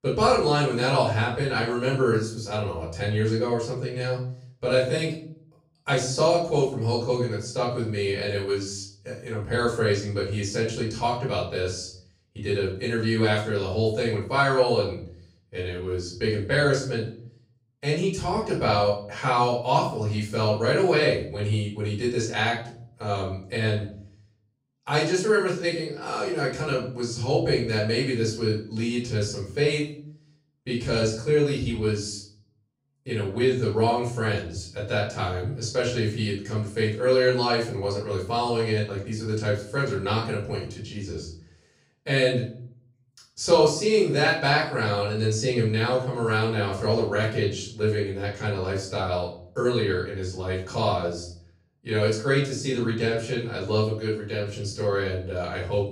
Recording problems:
off-mic speech; far
room echo; noticeable; dies away in 0.5 s

